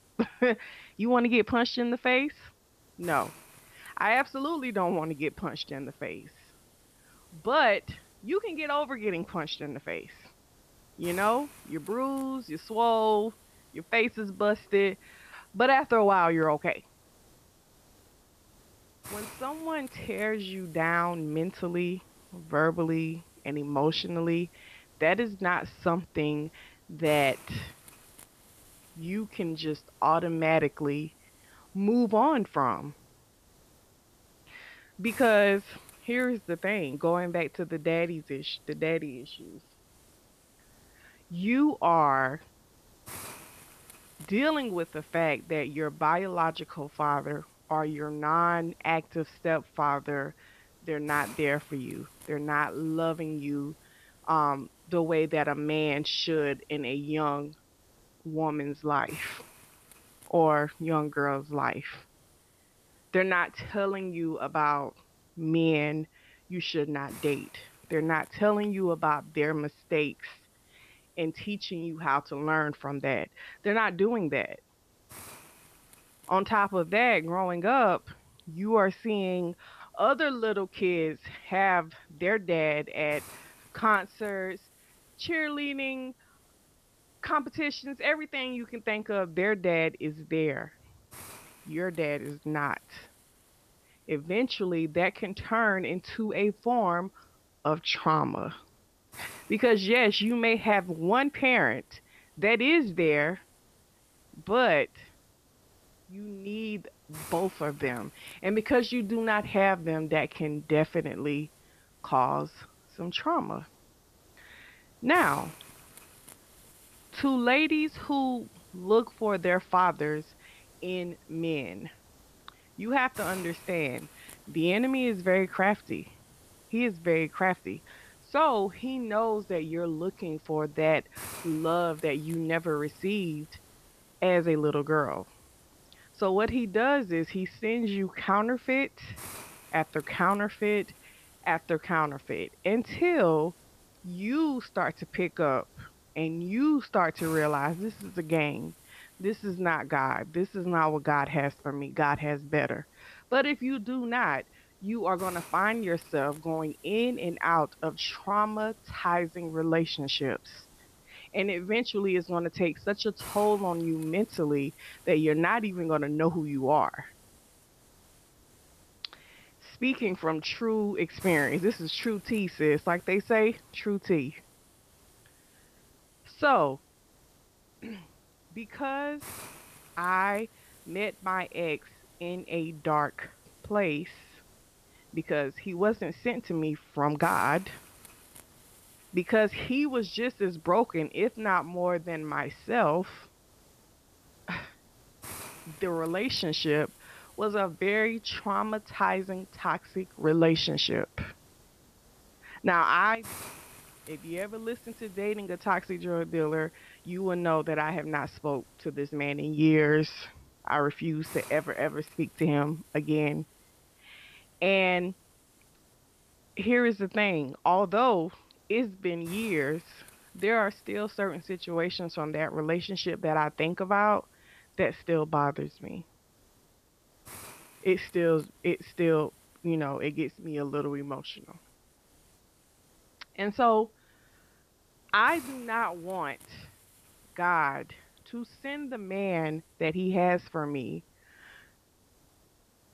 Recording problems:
high frequencies cut off; noticeable; nothing above 5.5 kHz
hiss; faint; throughout; 25 dB below the speech

